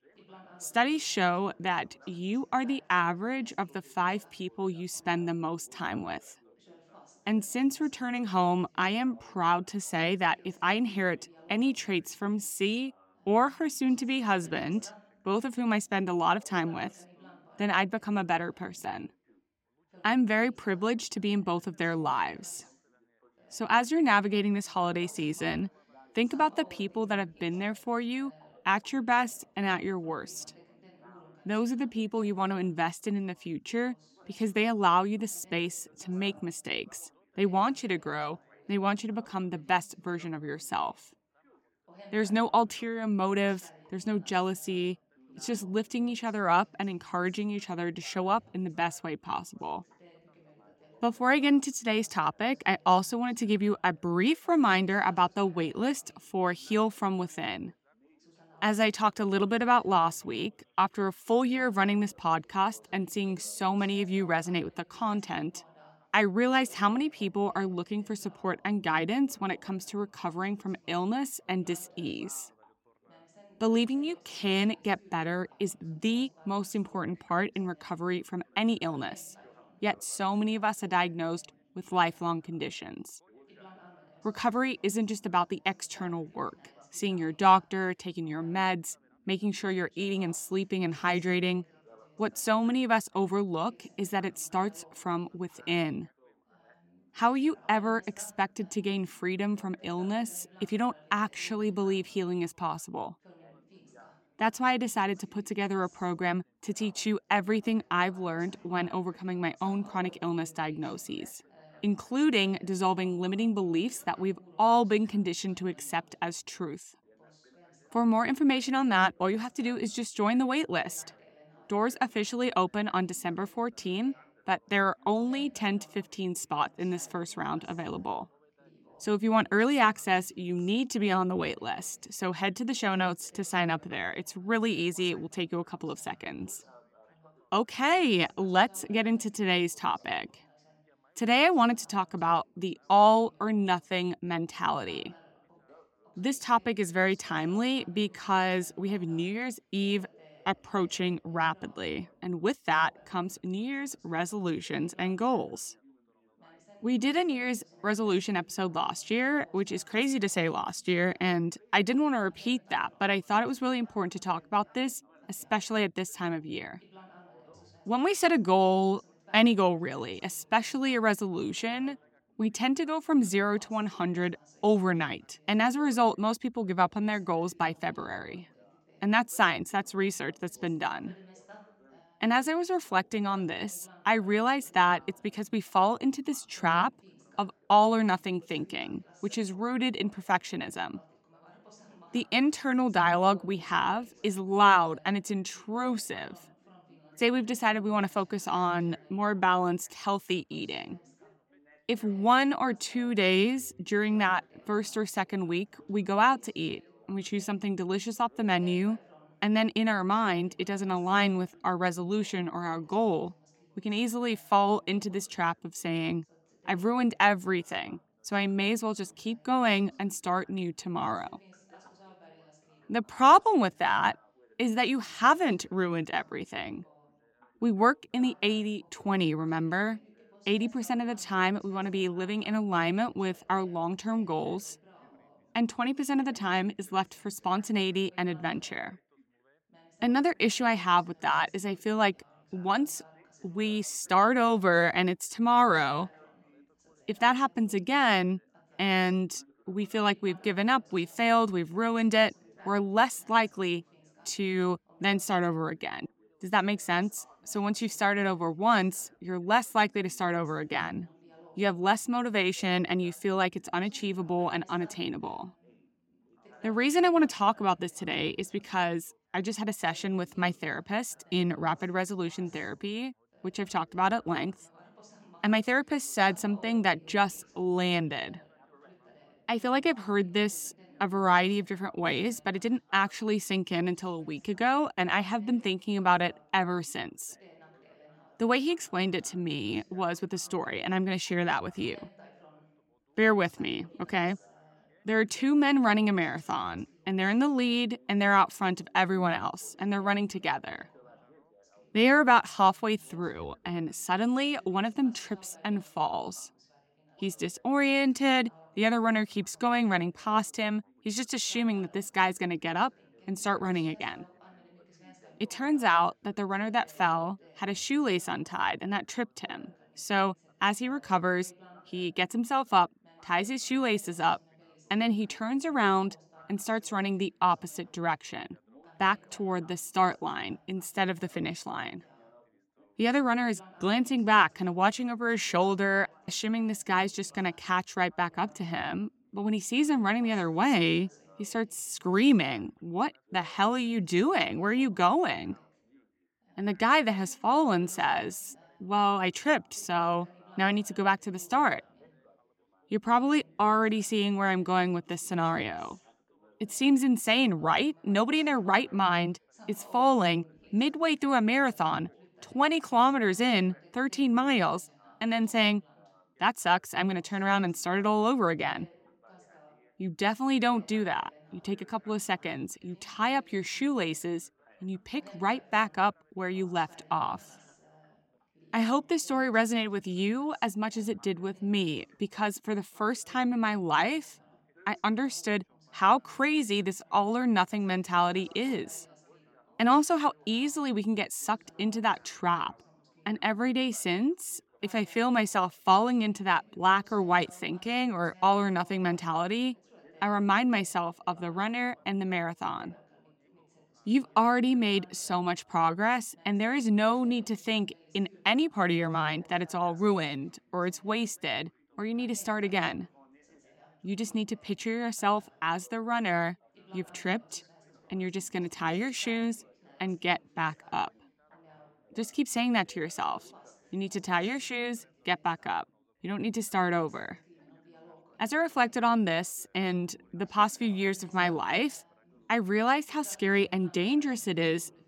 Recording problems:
background chatter; faint; throughout; 3 voices, 30 dB below the speech

